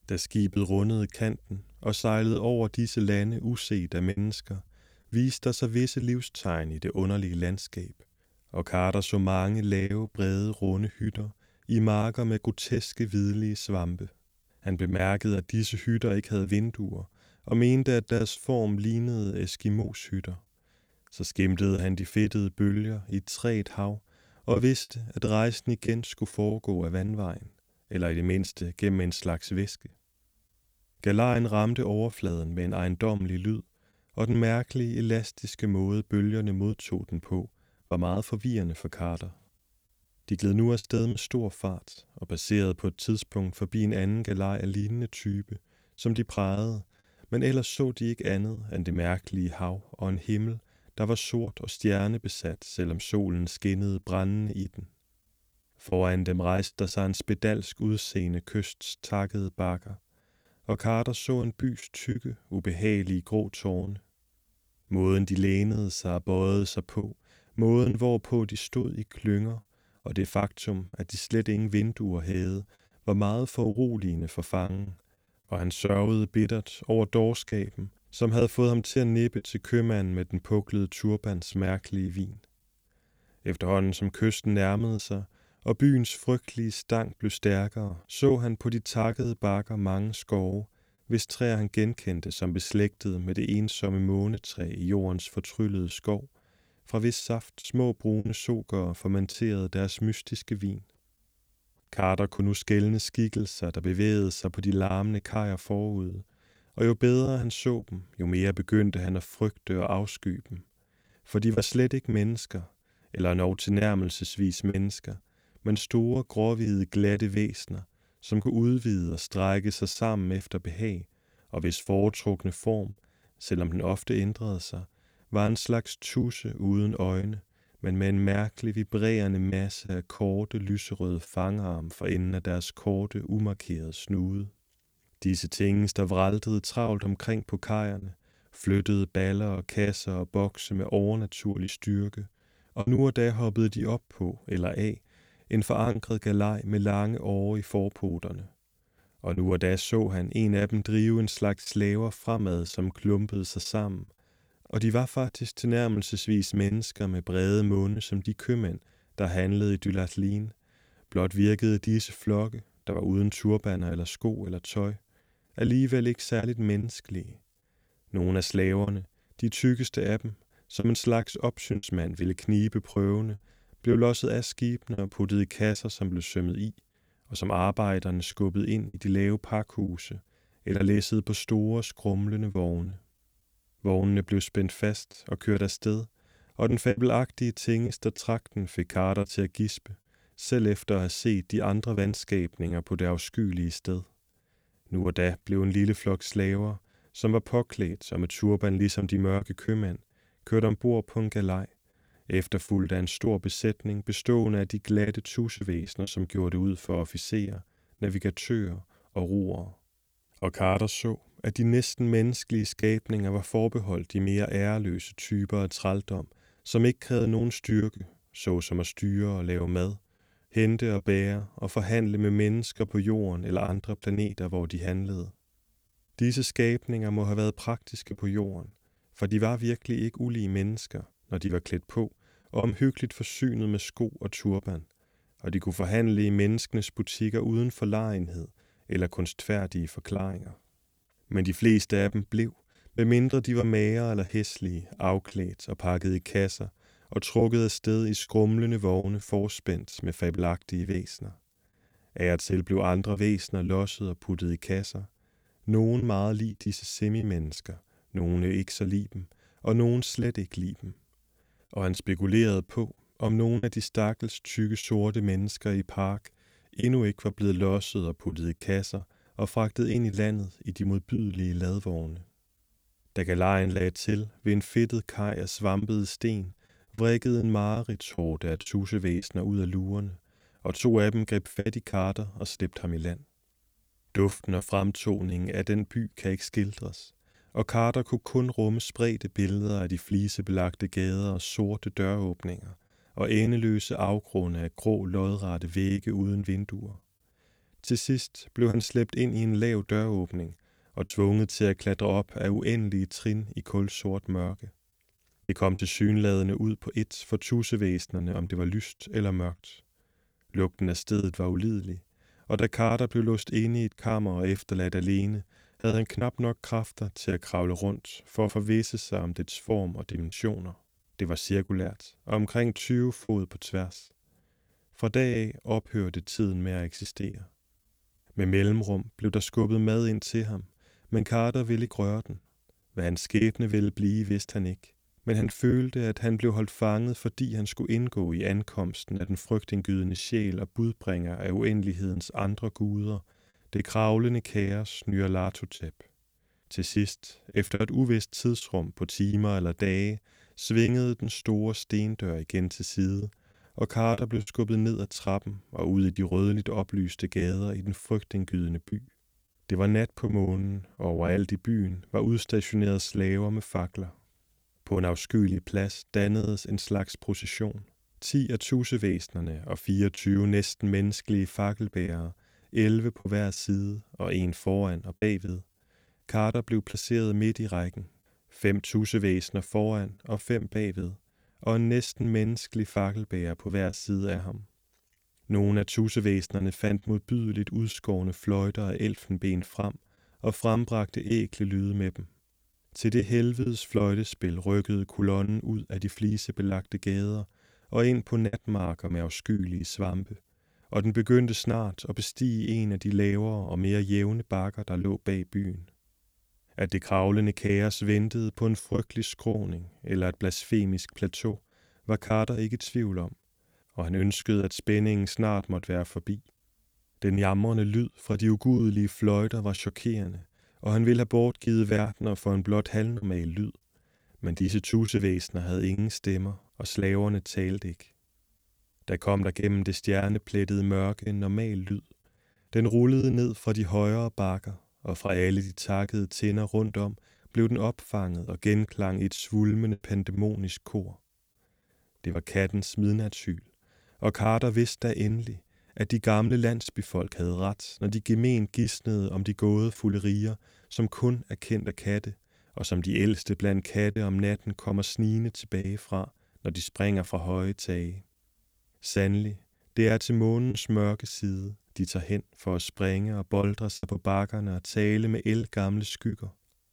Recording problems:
choppy; occasionally; 3% of the speech affected

